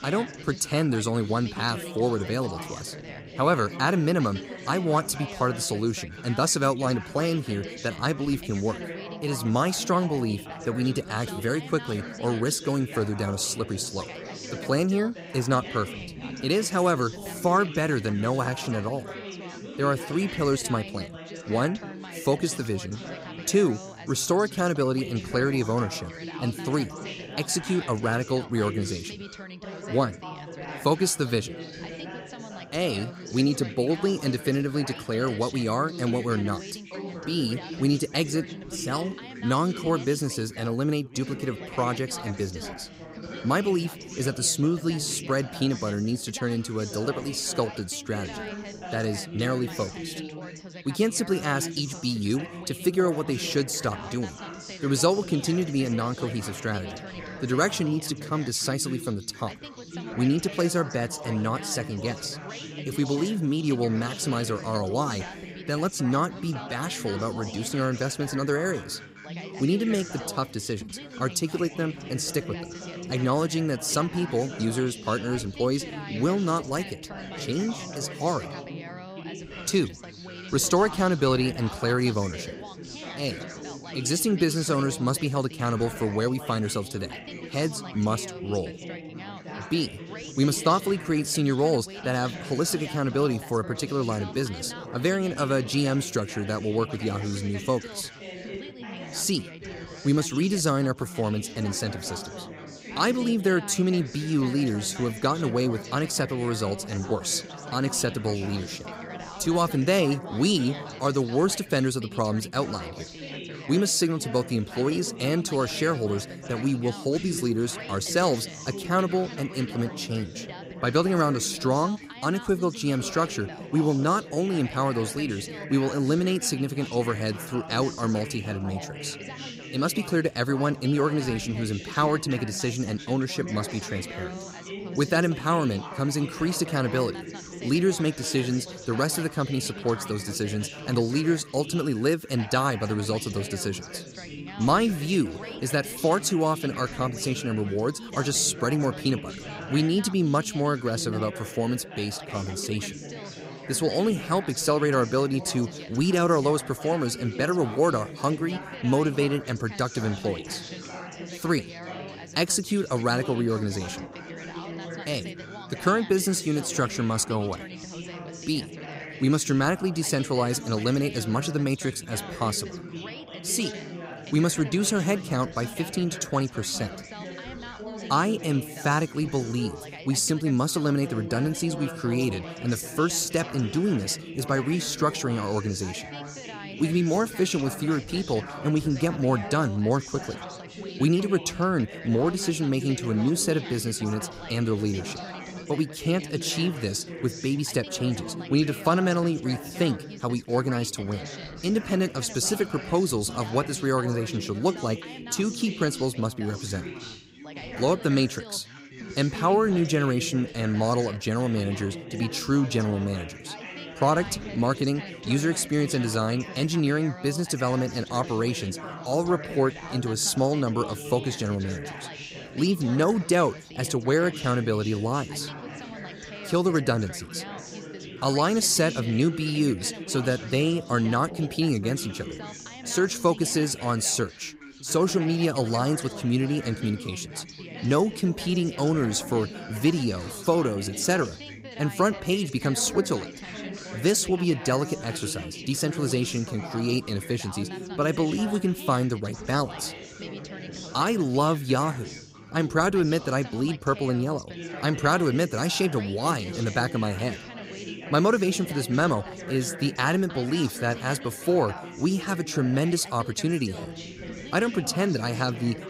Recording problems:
background chatter; noticeable; throughout; 4 voices, 10 dB below the speech

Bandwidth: 15.5 kHz